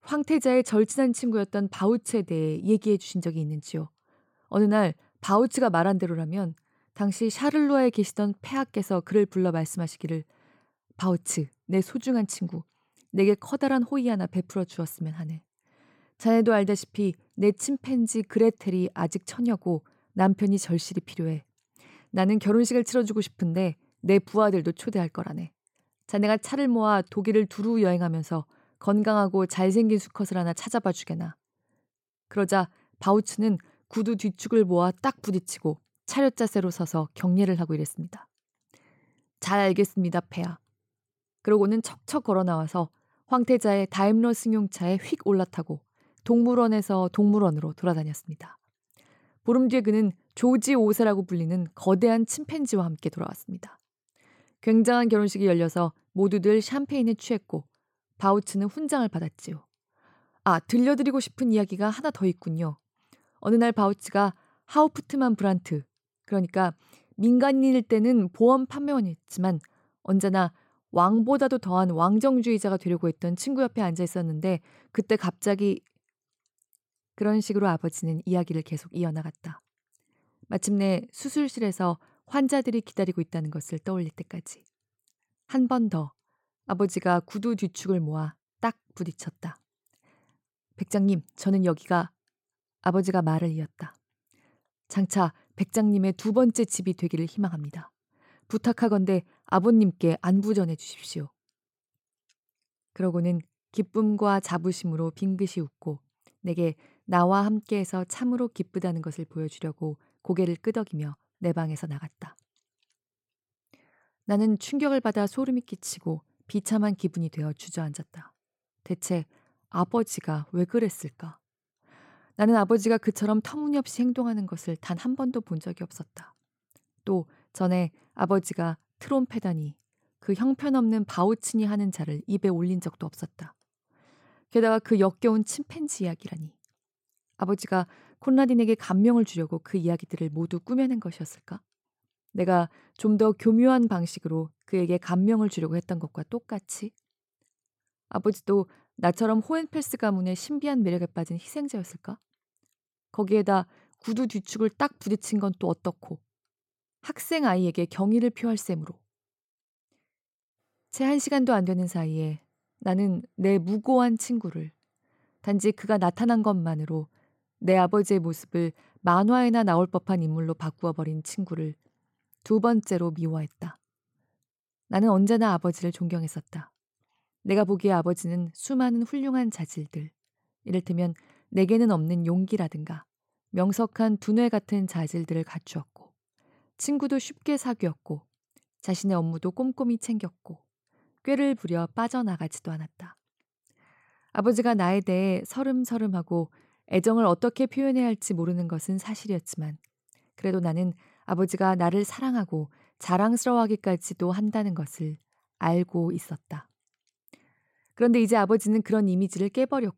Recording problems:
none

